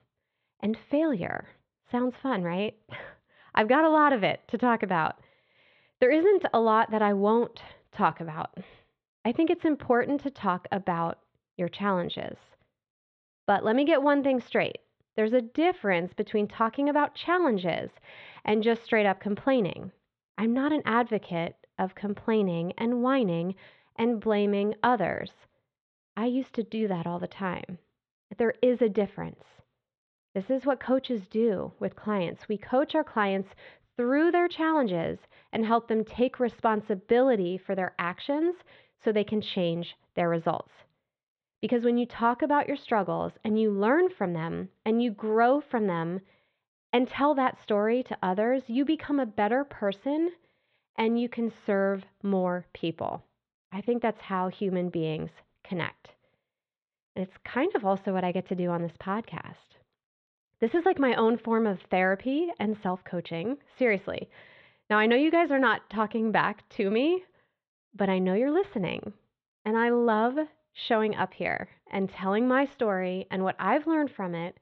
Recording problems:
muffled; slightly; fading above 3.5 kHz

